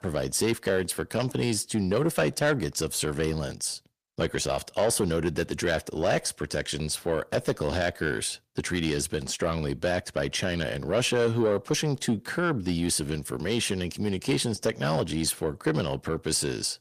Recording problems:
distortion; slight; 10 dB below the speech

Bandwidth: 15 kHz